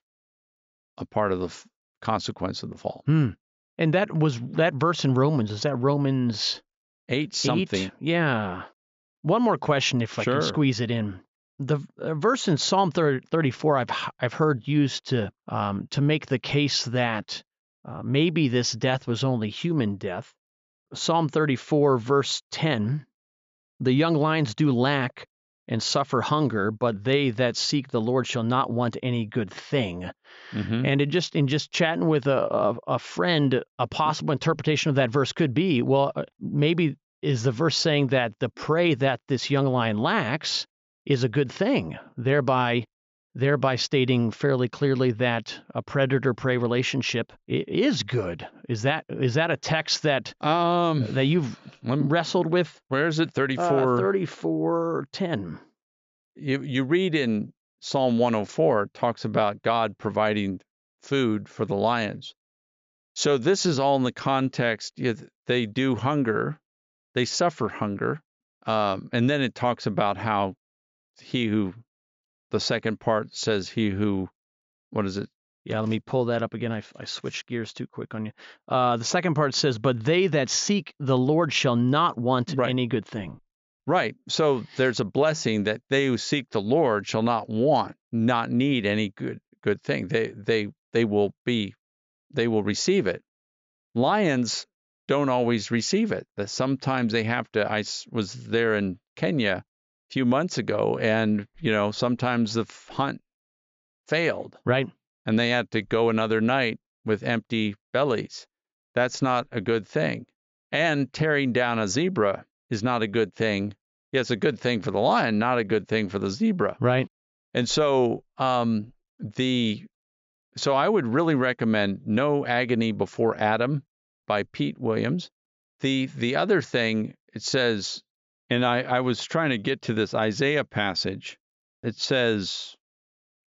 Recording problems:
high frequencies cut off; noticeable; nothing above 7.5 kHz

